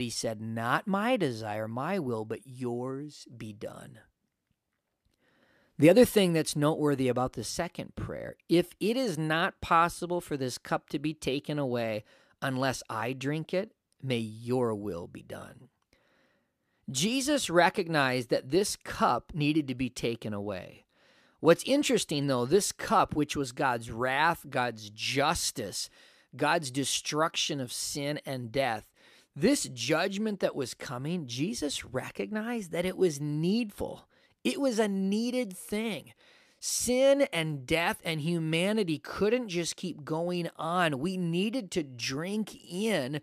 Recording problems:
abrupt cut into speech; at the start

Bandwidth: 14.5 kHz